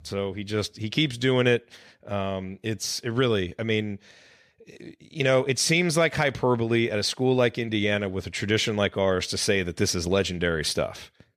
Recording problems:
none

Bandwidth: 14 kHz